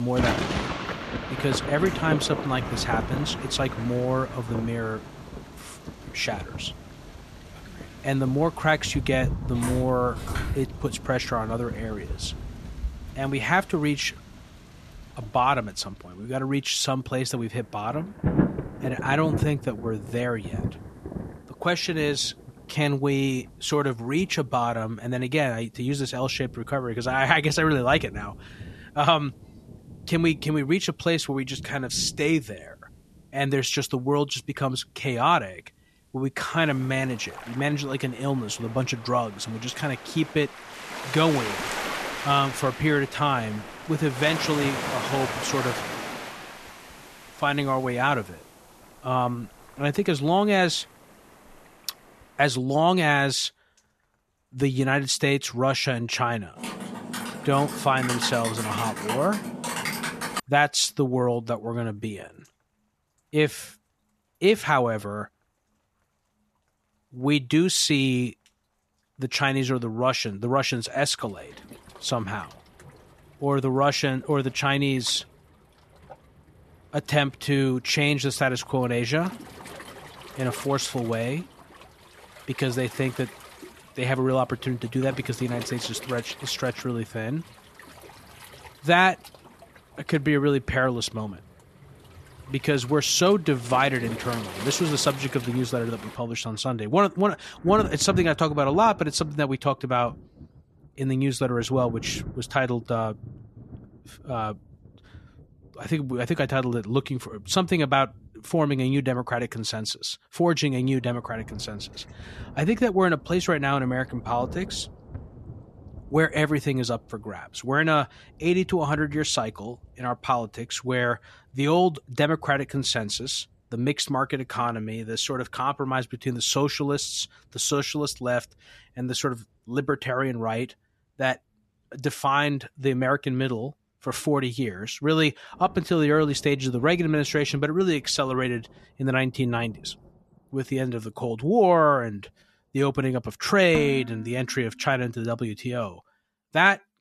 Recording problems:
rain or running water; noticeable; throughout; 10 dB below the speech
abrupt cut into speech; at the start
footsteps; noticeable; from 9.5 to 11 s; peak 9 dB below the speech
keyboard typing; noticeable; from 57 s to 1:00; peak 3 dB below the speech
clattering dishes; noticeable; at 2:24; peak 8 dB below the speech

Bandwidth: 13.5 kHz